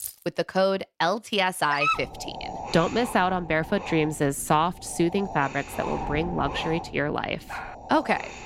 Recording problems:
wind noise on the microphone; occasional gusts; from 2 s on; 10 dB below the speech
jangling keys; faint; at the start; peak 10 dB below the speech
dog barking; loud; at 1.5 s; peak 1 dB above the speech
dog barking; faint; at 7.5 s; peak 10 dB below the speech

